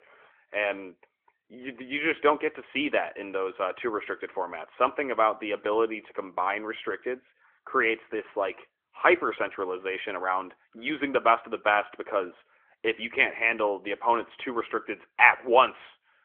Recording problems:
phone-call audio; nothing above 3.5 kHz

